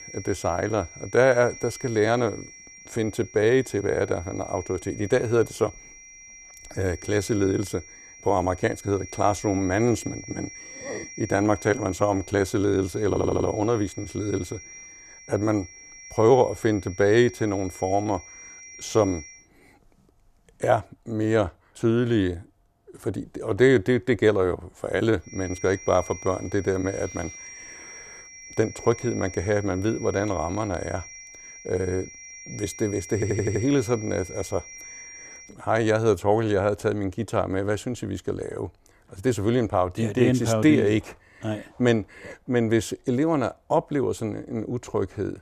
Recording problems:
high-pitched whine; noticeable; until 19 s and from 25 to 35 s; 5.5 kHz, 15 dB below the speech
audio stuttering; at 13 s and at 33 s

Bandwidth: 14.5 kHz